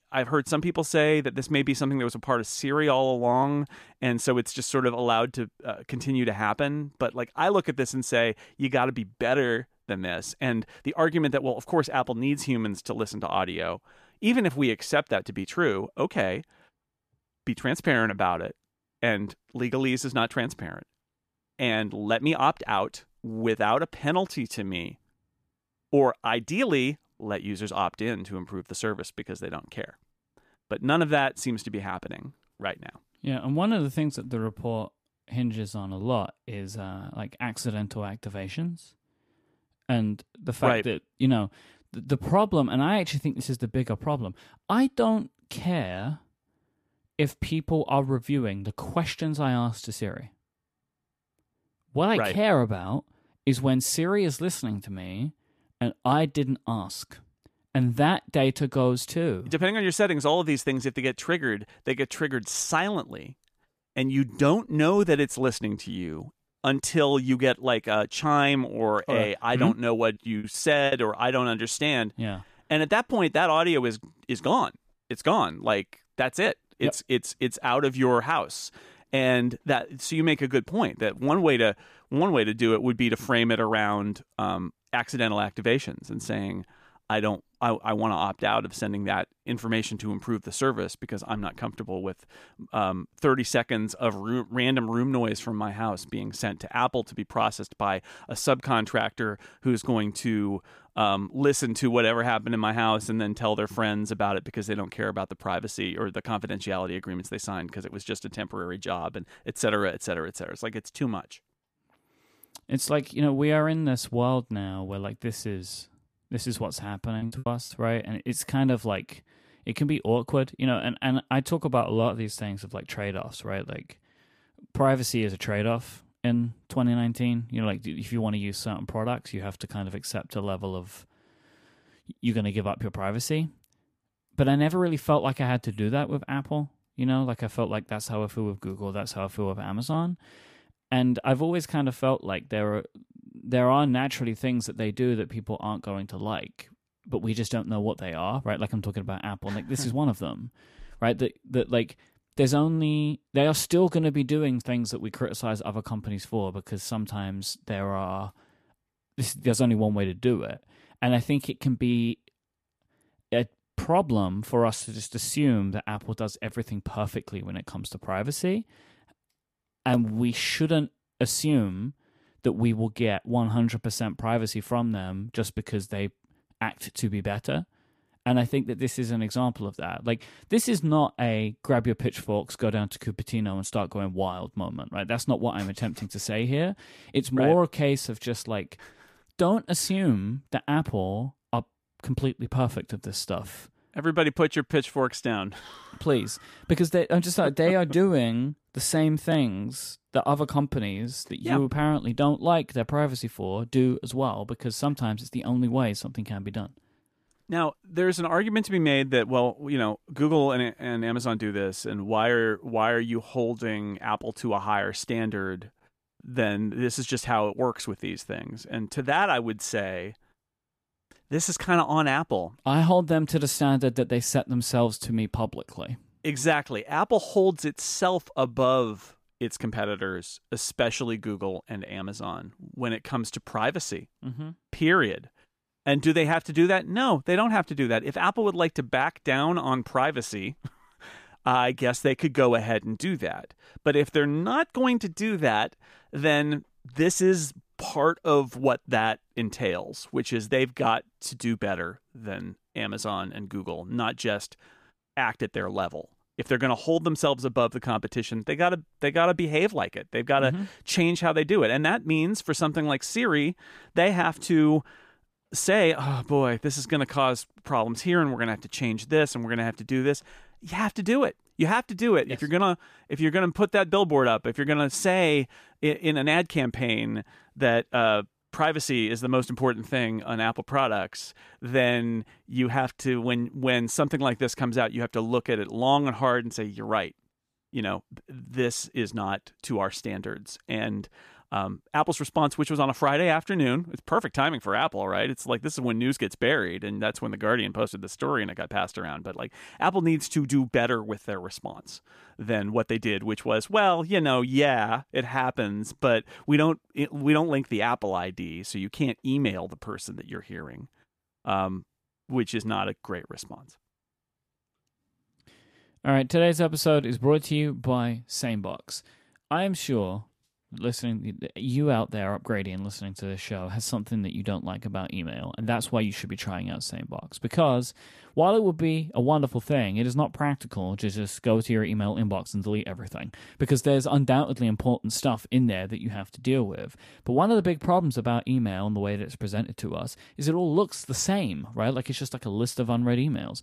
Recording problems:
choppy; very; at 1:10 and from 1:57 to 1:58; 12% of the speech affected

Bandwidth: 14.5 kHz